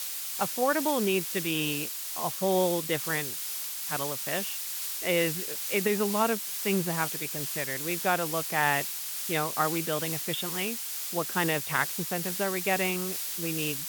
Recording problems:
high frequencies cut off; severe; nothing above 4 kHz
hiss; loud; throughout; 2 dB below the speech

